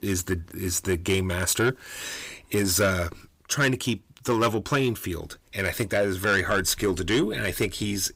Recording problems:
distortion; slight; 10 dB below the speech

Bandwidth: 15.5 kHz